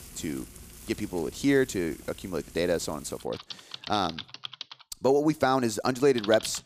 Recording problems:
household noises; noticeable; throughout; 15 dB below the speech

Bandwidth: 15 kHz